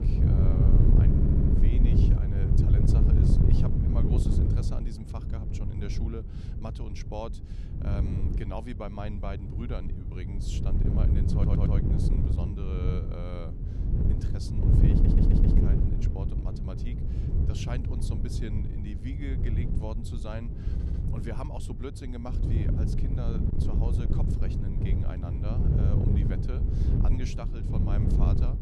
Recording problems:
wind noise on the microphone; heavy; 4 dB above the speech
audio stuttering; 4 times, first at 1 s

